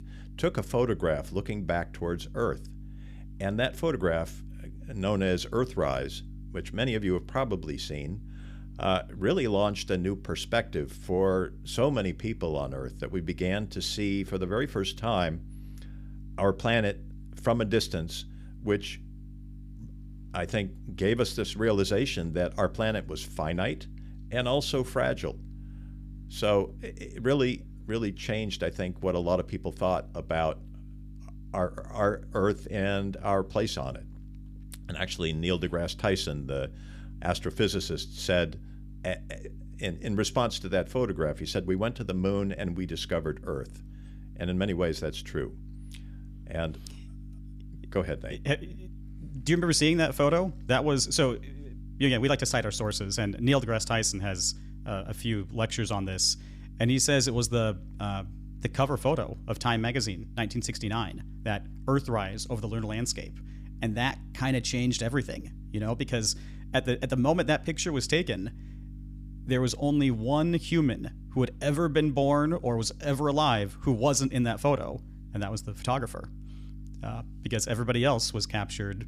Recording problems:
electrical hum; faint; throughout; 50 Hz, 25 dB below the speech

